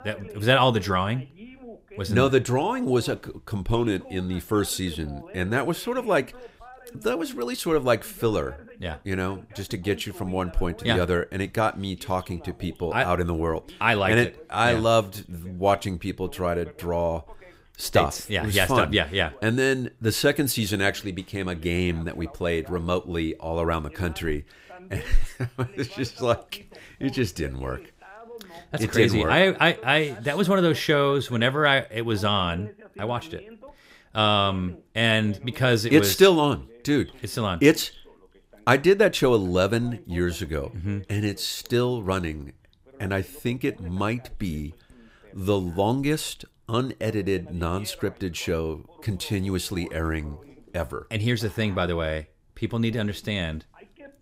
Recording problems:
voice in the background; faint; throughout; 25 dB below the speech

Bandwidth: 15.5 kHz